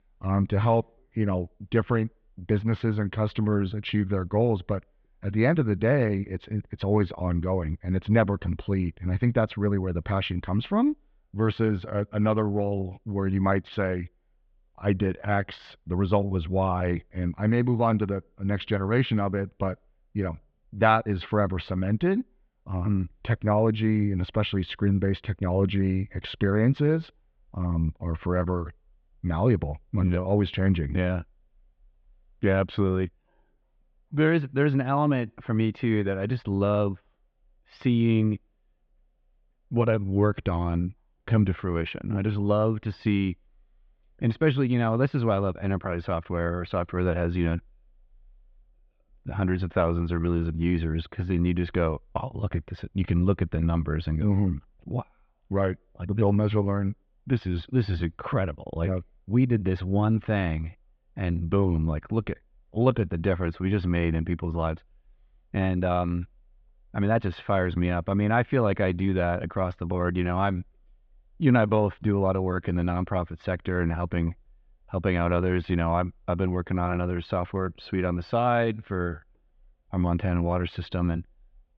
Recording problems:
muffled; very; fading above 3.5 kHz

